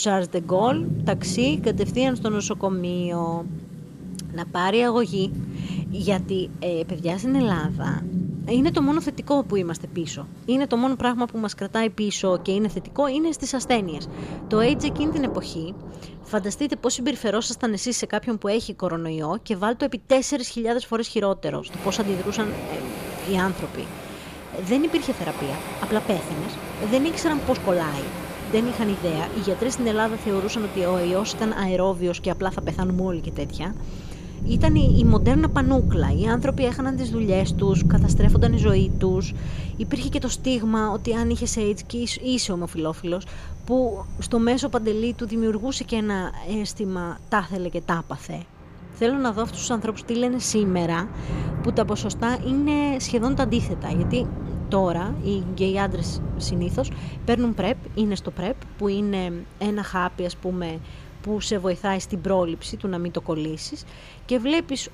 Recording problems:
rain or running water; loud; throughout; 5 dB below the speech
abrupt cut into speech; at the start

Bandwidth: 15 kHz